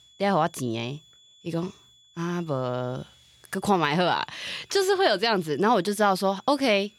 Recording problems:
high-pitched whine; faint; throughout; 3.5 kHz, 30 dB below the speech

